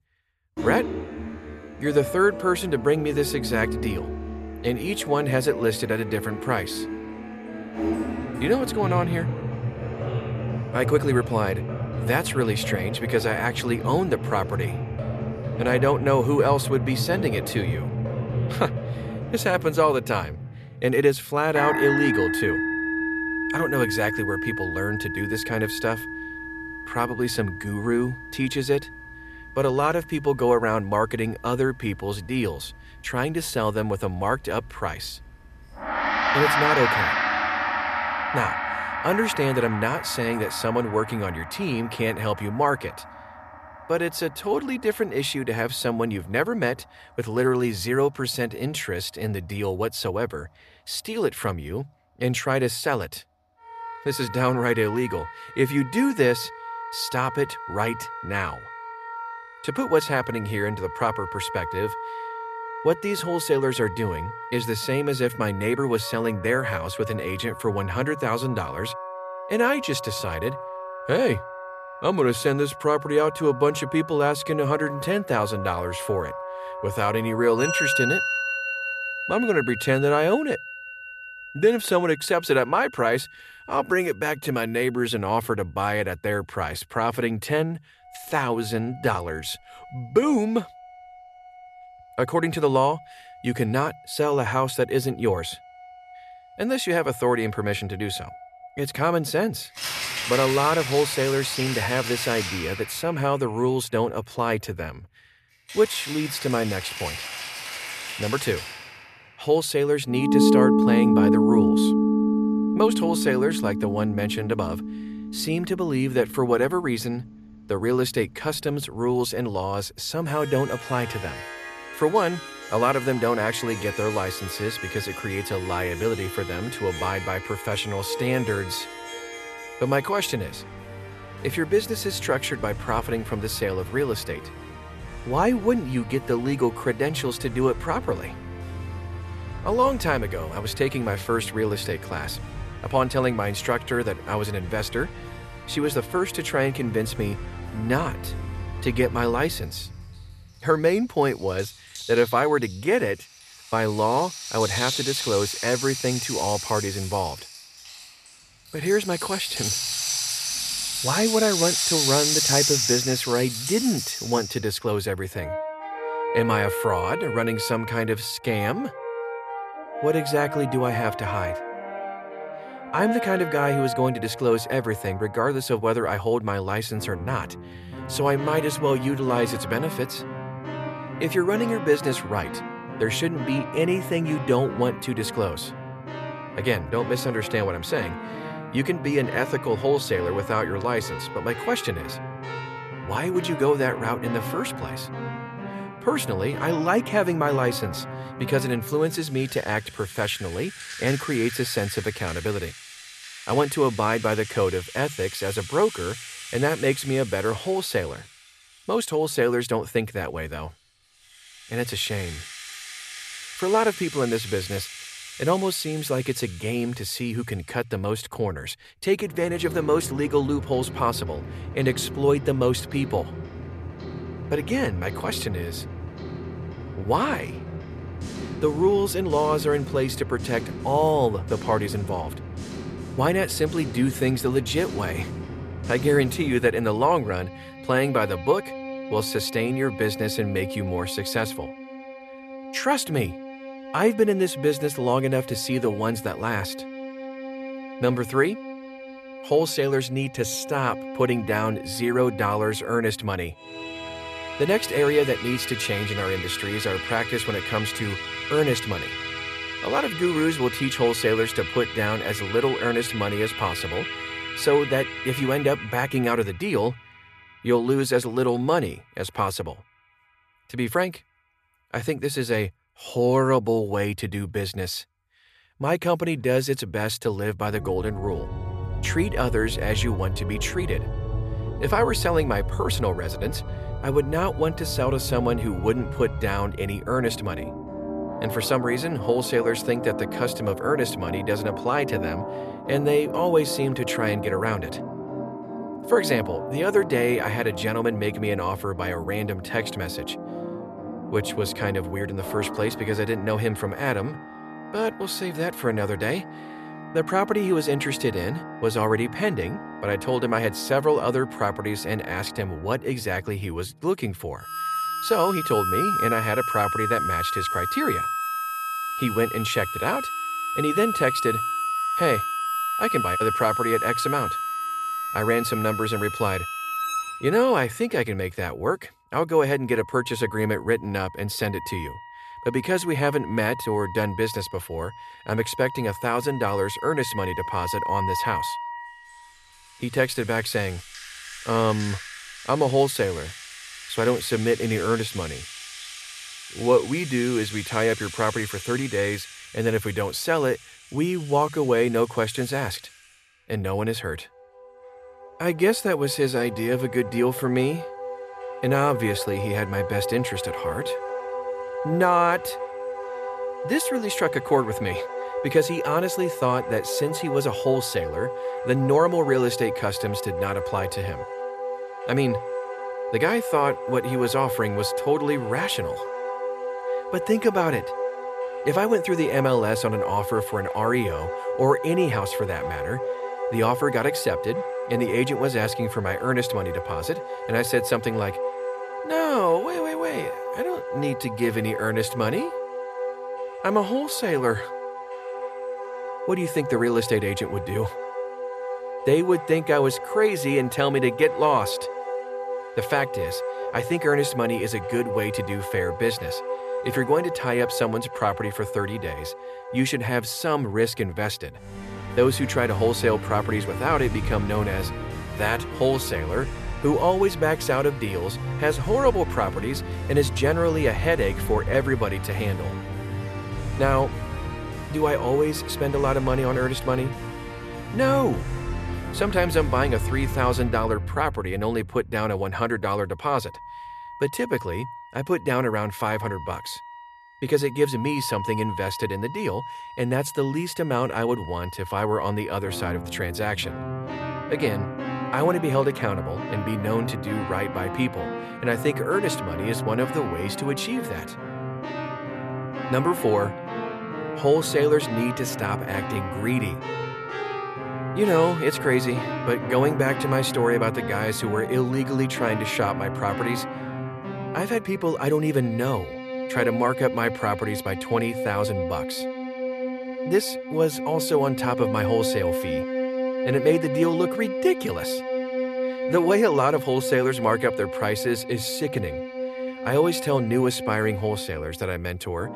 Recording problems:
background music; loud; throughout; 6 dB below the speech

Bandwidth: 14 kHz